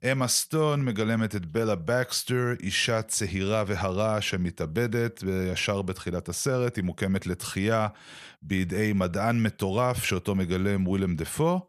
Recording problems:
none

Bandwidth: 14 kHz